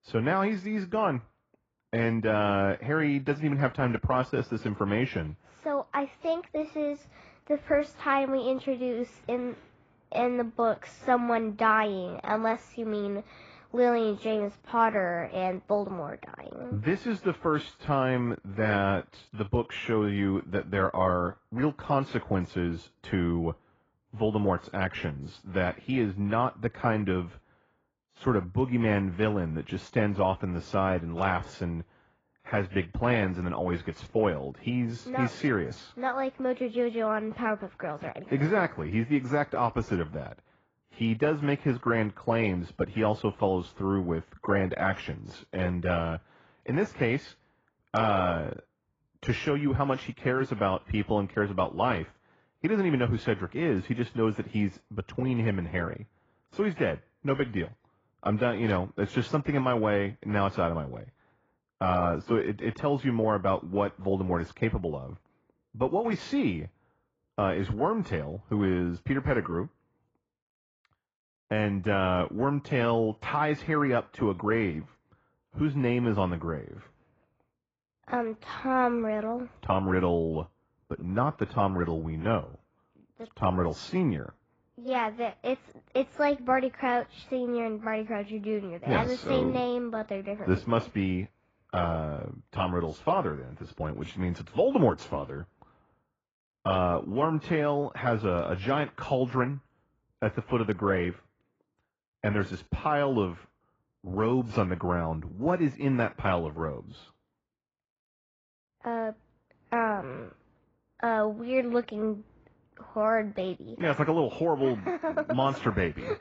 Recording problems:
garbled, watery; badly
muffled; very; fading above 3.5 kHz

